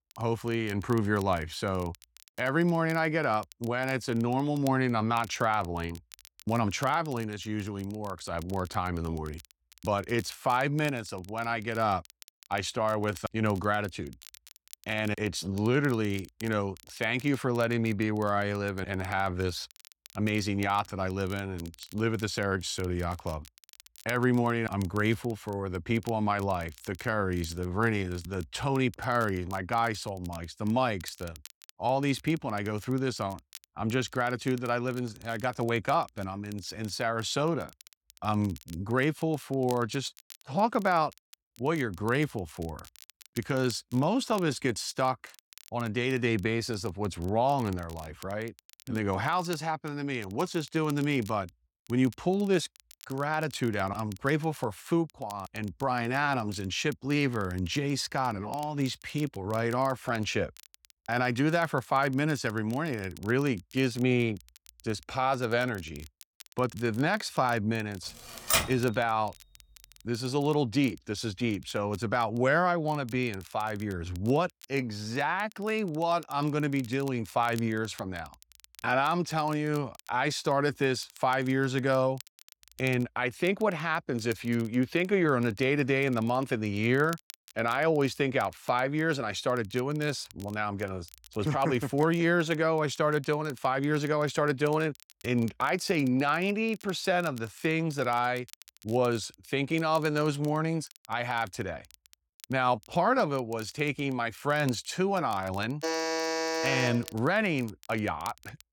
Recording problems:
crackle, like an old record; faint; 25 dB below the speech
keyboard typing; loud; at 1:08; peak 4 dB above the speech
alarm; loud; from 1:46 to 1:47; peak level with the speech

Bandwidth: 17 kHz